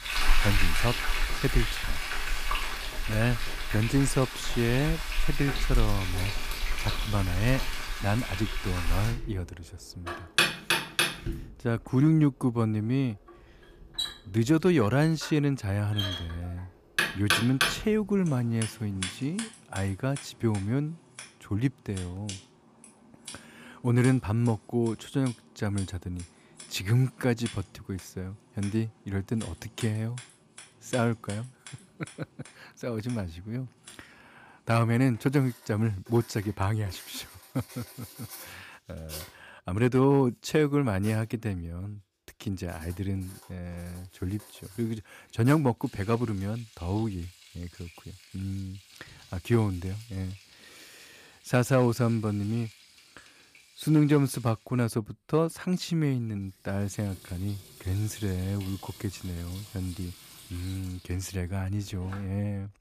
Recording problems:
household noises; loud; throughout; 4 dB below the speech

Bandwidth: 15 kHz